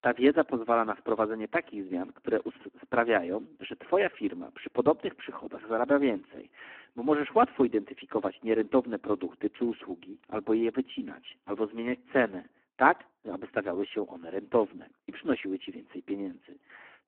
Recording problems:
phone-call audio; poor line

